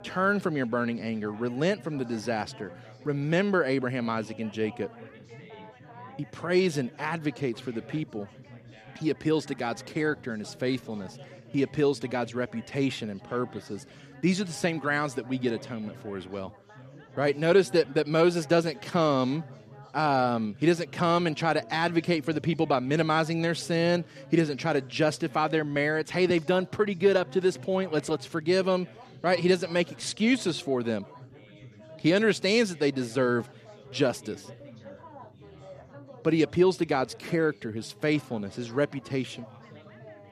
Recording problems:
chatter from many people; faint; throughout; 20 dB below the speech

